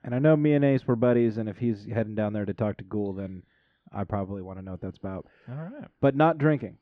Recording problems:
muffled; very; fading above 2 kHz

